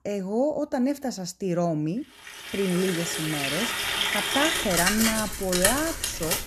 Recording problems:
household noises; very loud; from 2.5 s on; 2 dB above the speech

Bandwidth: 13.5 kHz